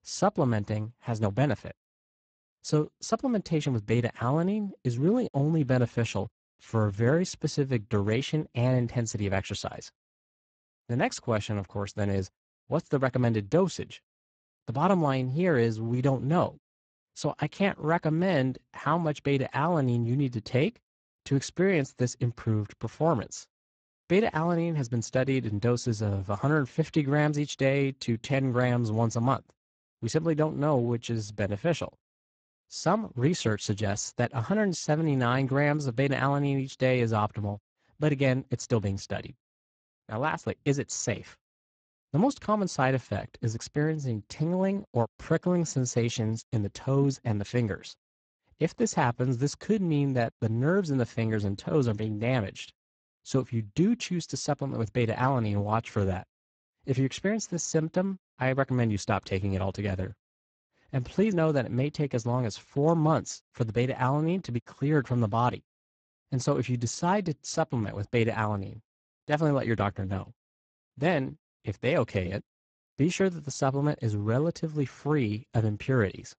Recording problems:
garbled, watery; badly; nothing above 7.5 kHz

